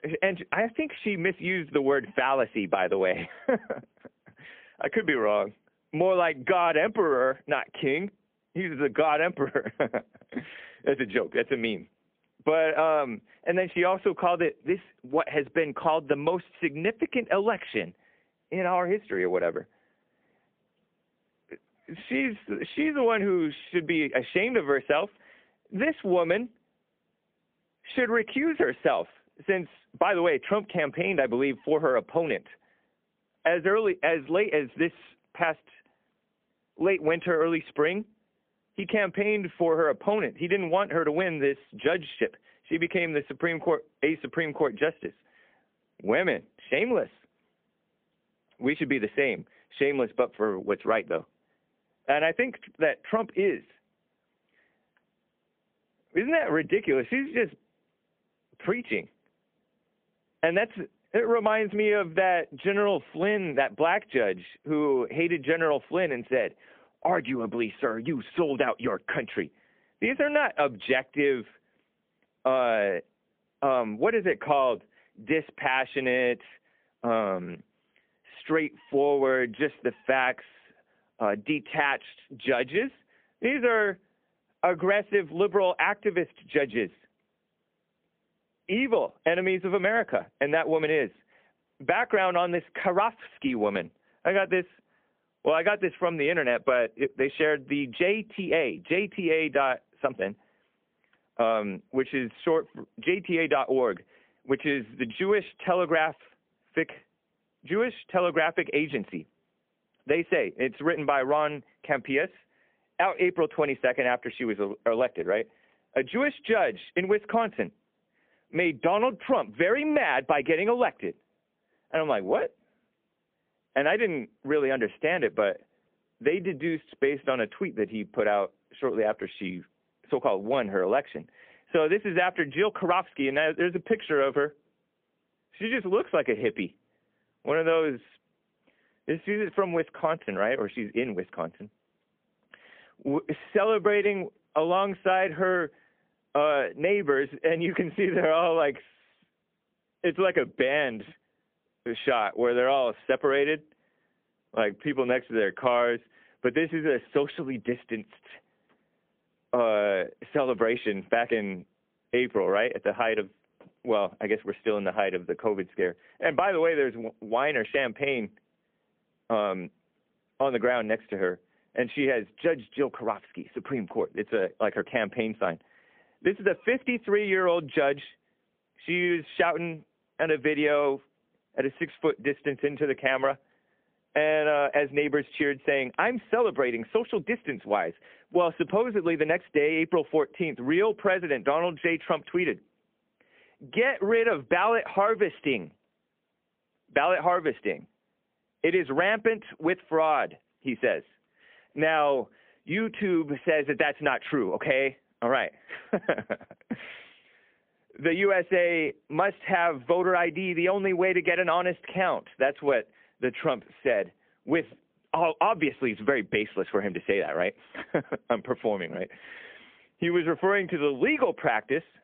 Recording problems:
phone-call audio; poor line; nothing above 3.5 kHz

